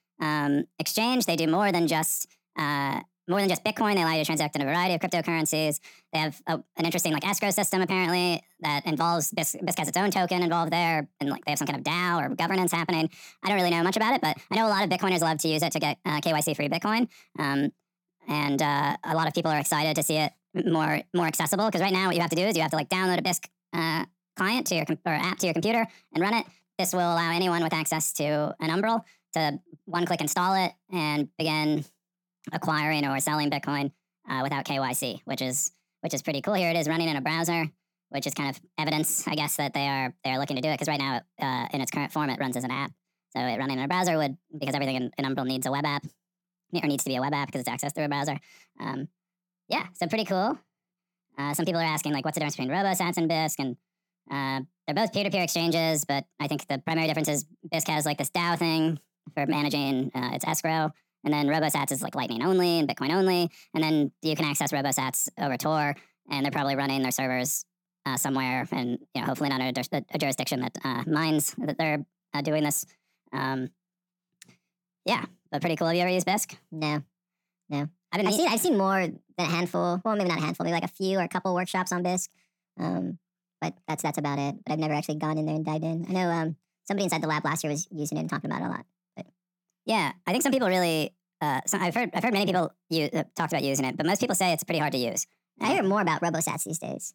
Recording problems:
wrong speed and pitch; too fast and too high; 1.5 times normal speed

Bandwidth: 17 kHz